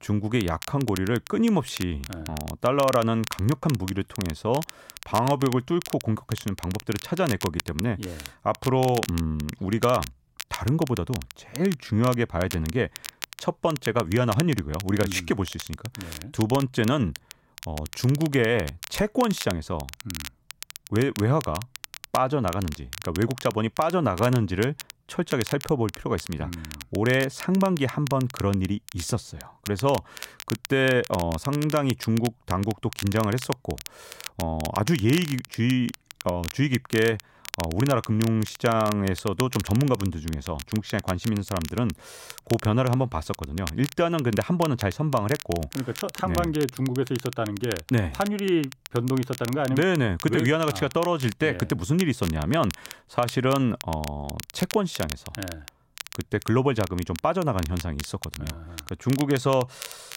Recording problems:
crackle, like an old record; noticeable; 15 dB below the speech

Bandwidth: 16 kHz